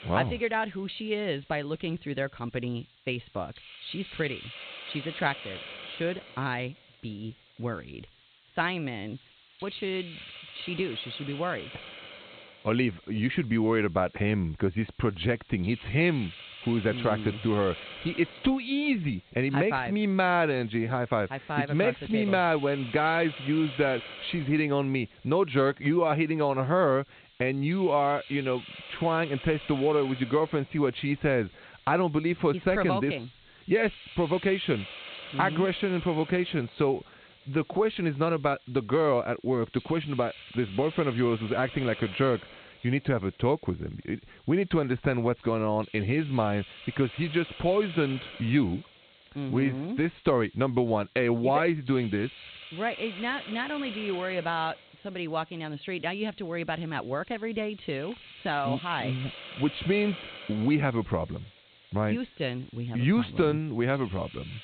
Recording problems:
high frequencies cut off; severe; nothing above 4 kHz
hiss; noticeable; throughout; 15 dB below the speech

